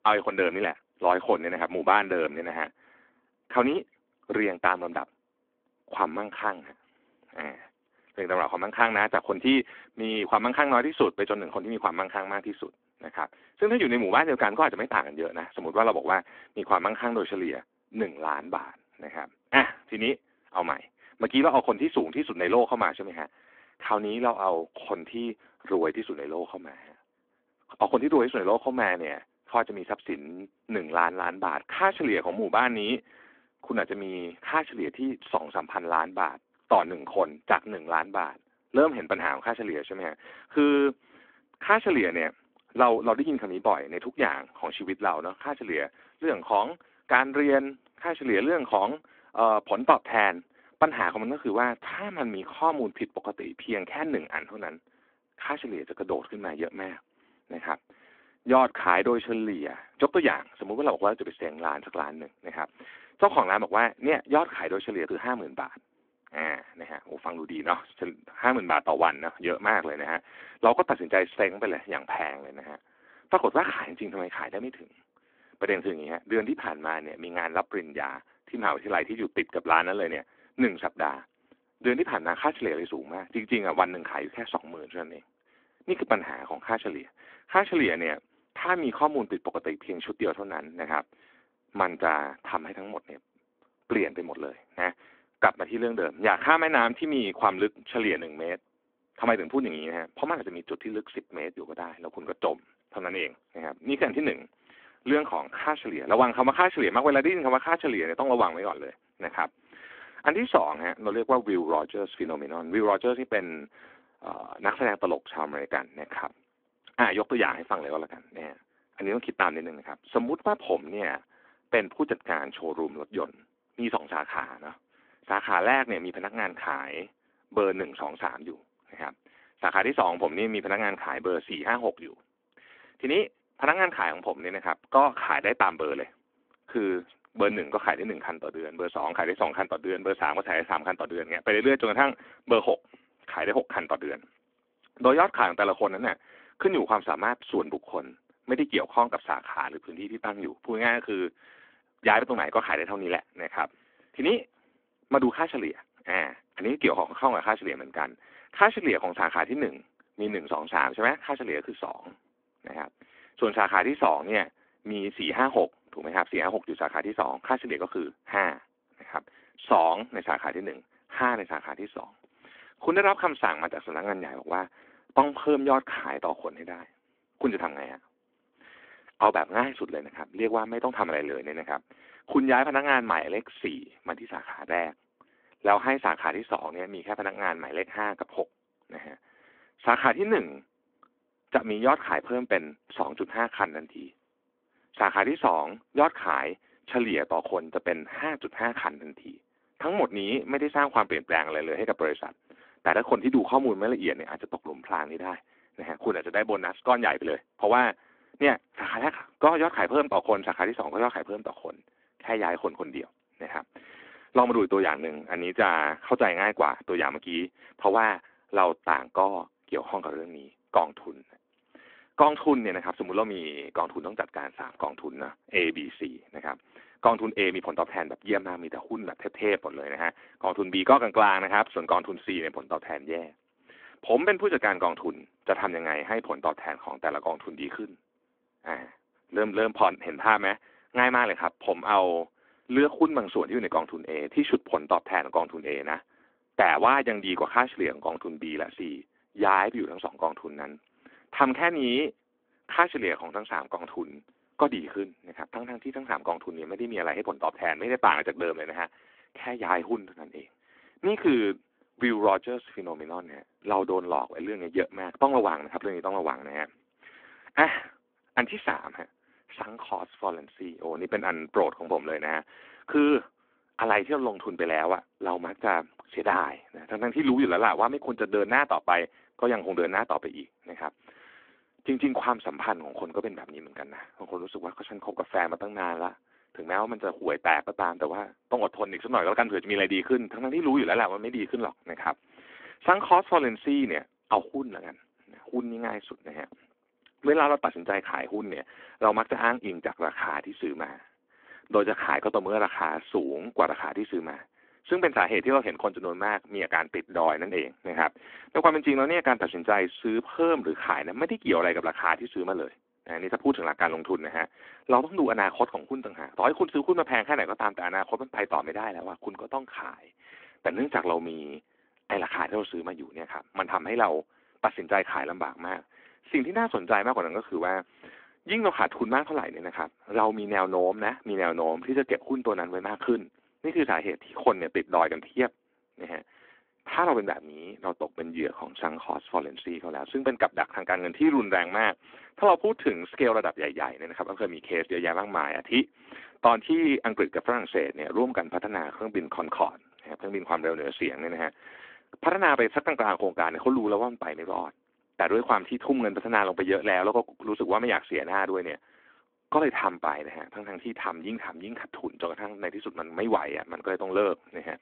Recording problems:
phone-call audio

